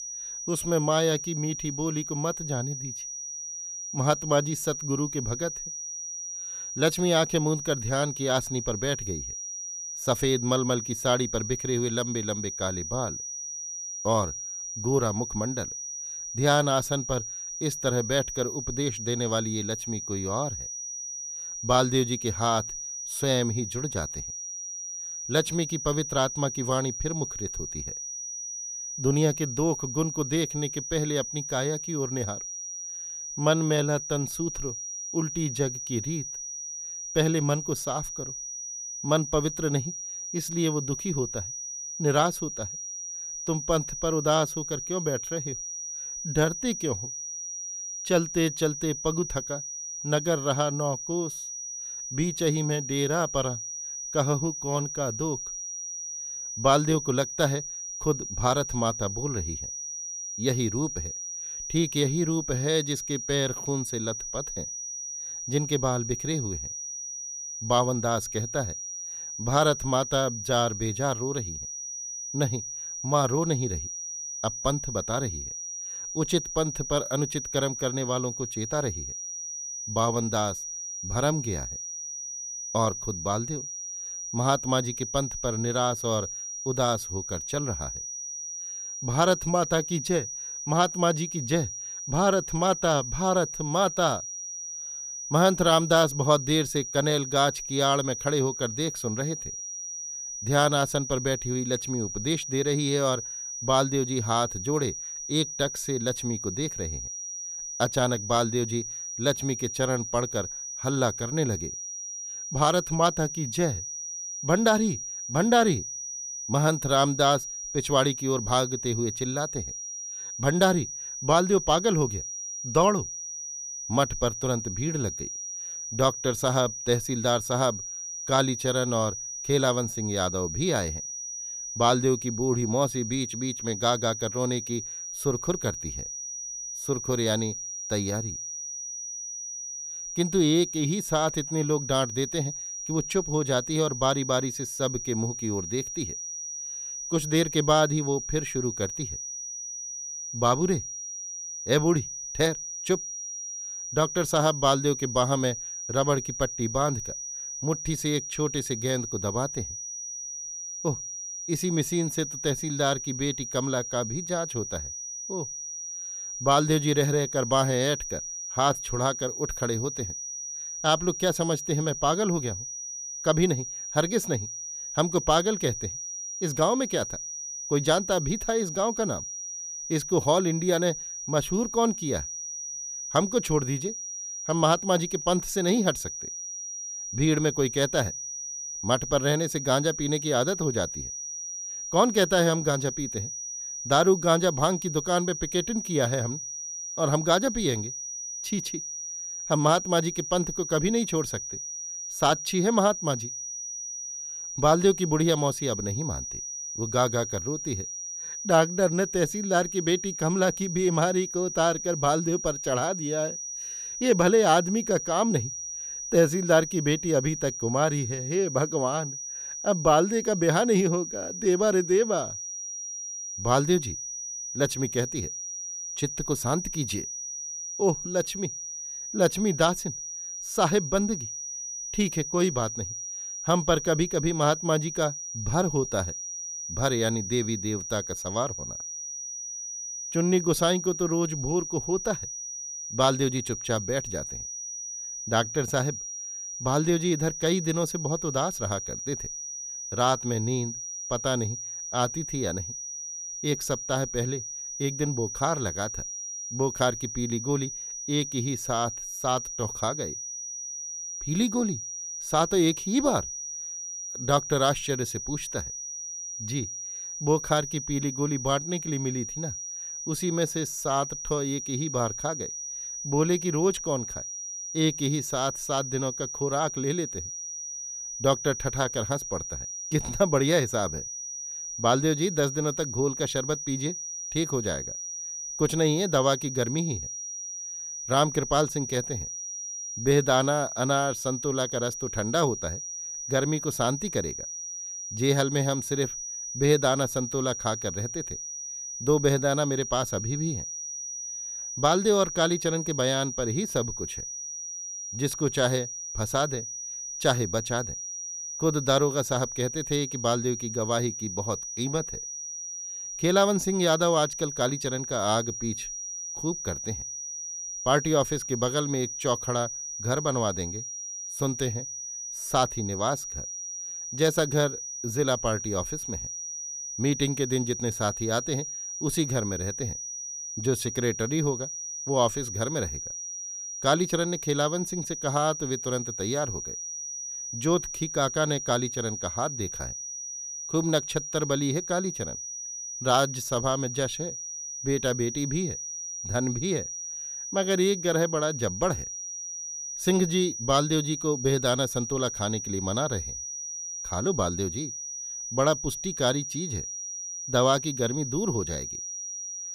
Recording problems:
high-pitched whine; loud; throughout; 6 kHz, 6 dB below the speech

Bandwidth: 15 kHz